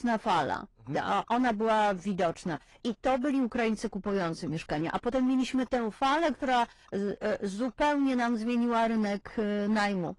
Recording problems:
distortion; slight; 10% of the sound clipped
garbled, watery; slightly; nothing above 10.5 kHz

